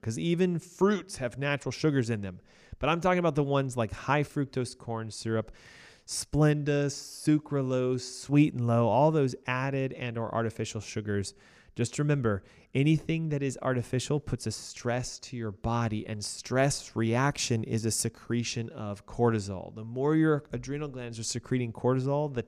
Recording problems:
none

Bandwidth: 15 kHz